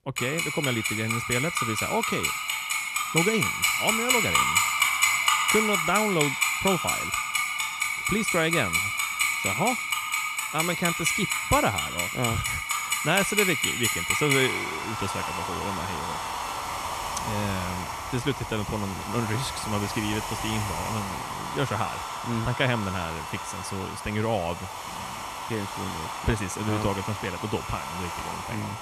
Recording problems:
household noises; very loud; throughout; 3 dB above the speech

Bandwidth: 14.5 kHz